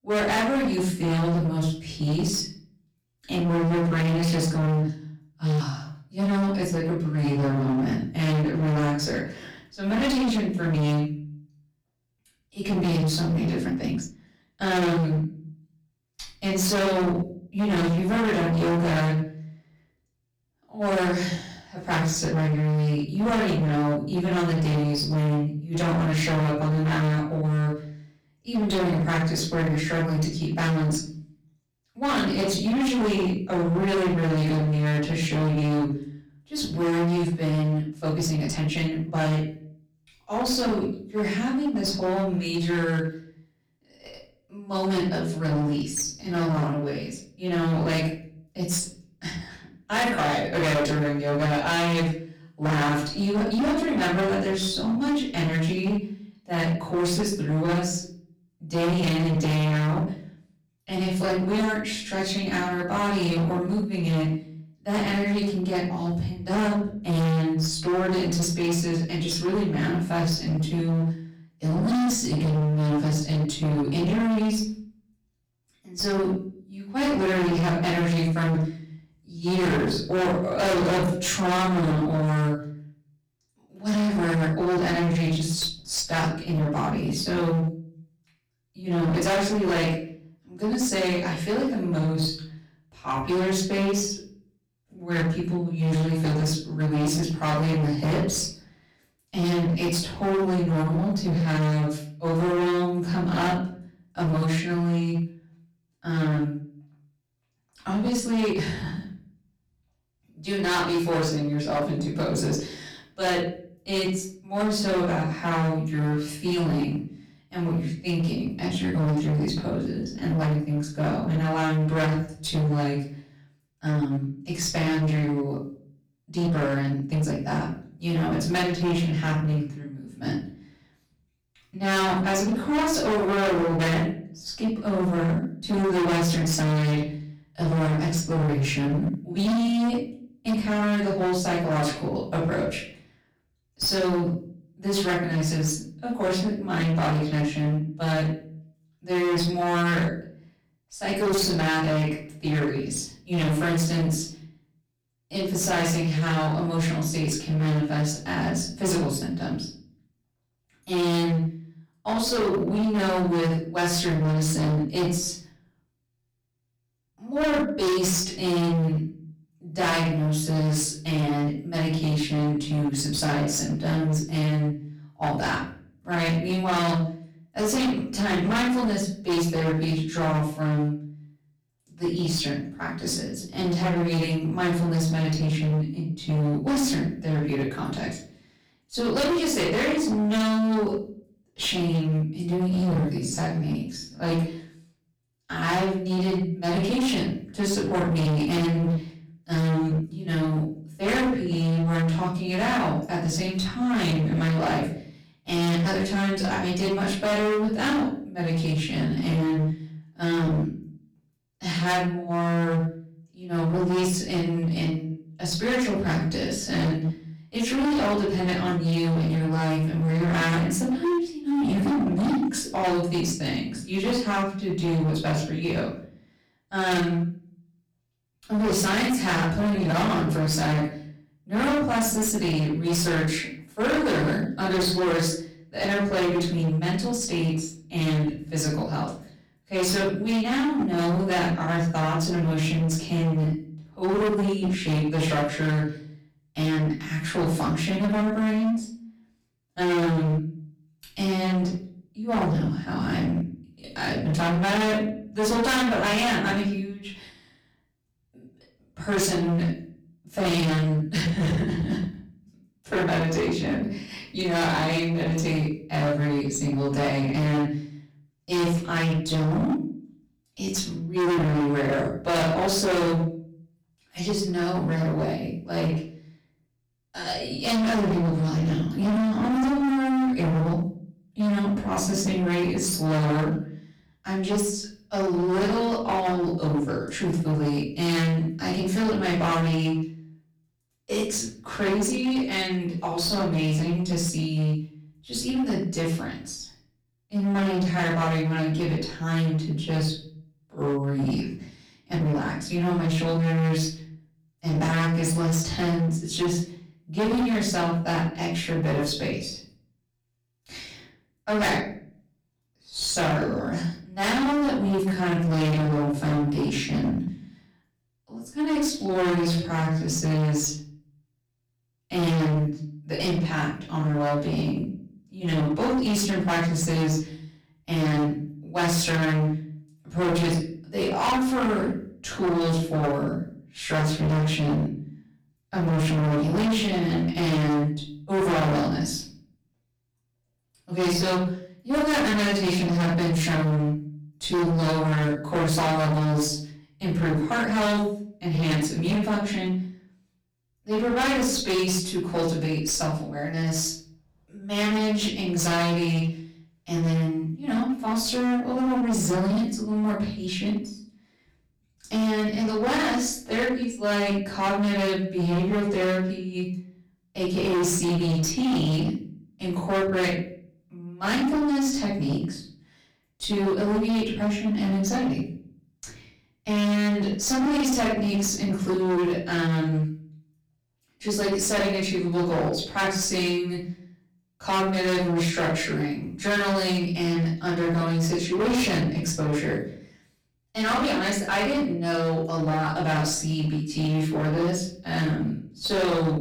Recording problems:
distortion; heavy; 22% of the sound clipped
off-mic speech; far
room echo; noticeable; dies away in 0.5 s
uneven, jittery; strongly; from 14 s to 5:20

